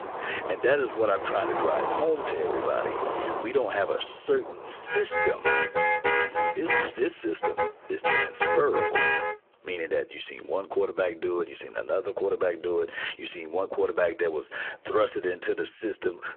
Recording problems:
phone-call audio; poor line
squashed, flat; somewhat
traffic noise; very loud; until 9 s; 2 dB above the speech

